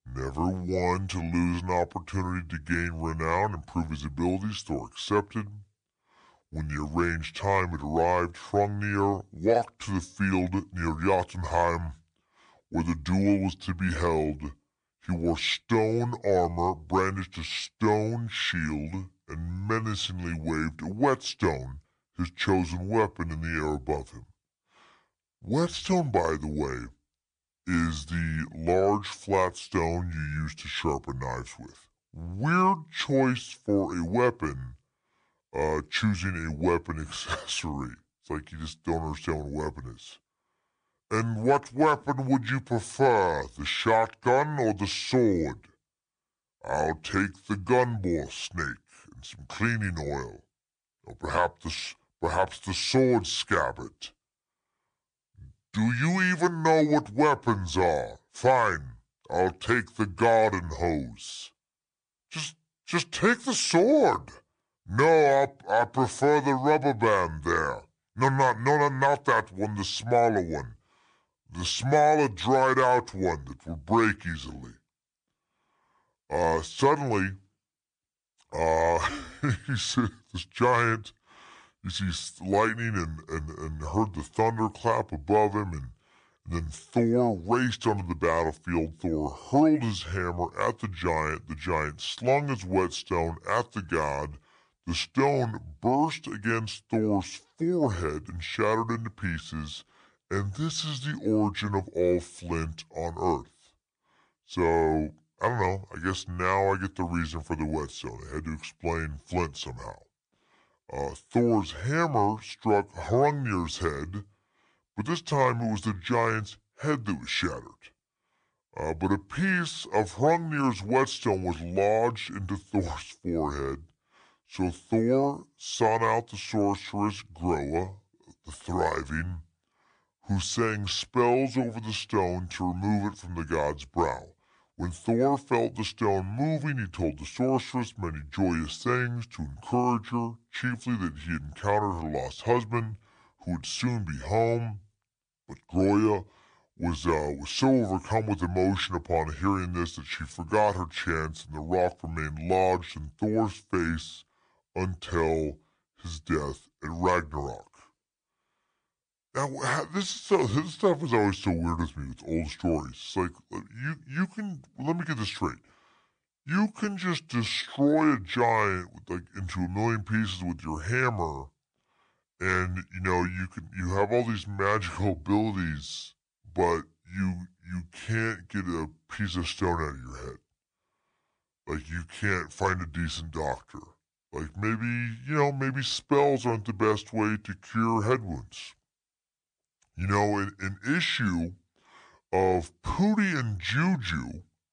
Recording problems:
wrong speed and pitch; too slow and too low; 0.7 times normal speed

